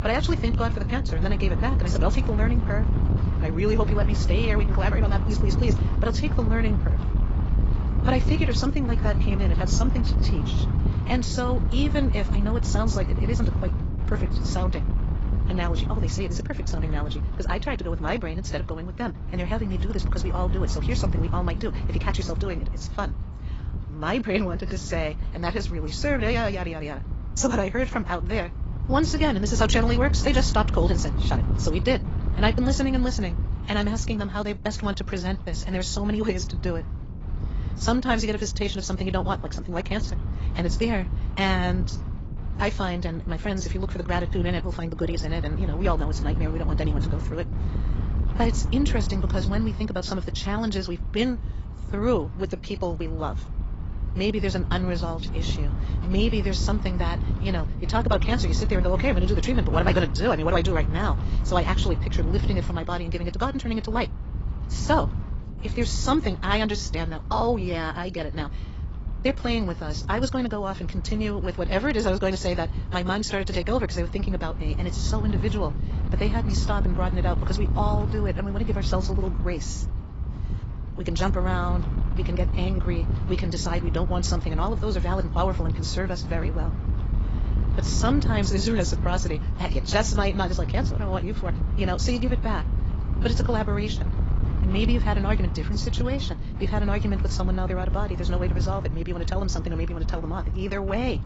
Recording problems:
garbled, watery; badly; nothing above 7.5 kHz
wrong speed, natural pitch; too fast; 1.6 times normal speed
wind noise on the microphone; occasional gusts; 10 dB below the speech

